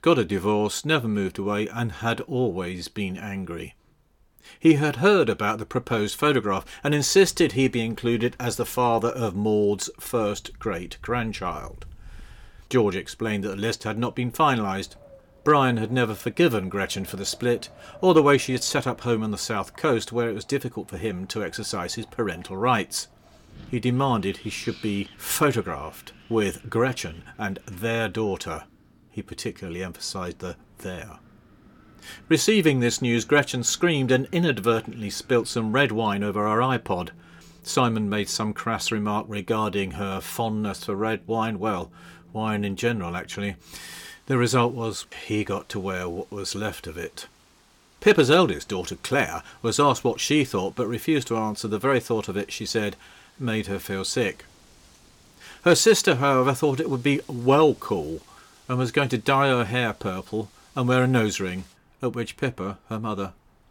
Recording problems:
wind in the background; faint; throughout; 30 dB below the speech

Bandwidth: 17.5 kHz